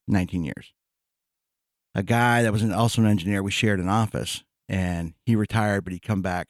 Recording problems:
none

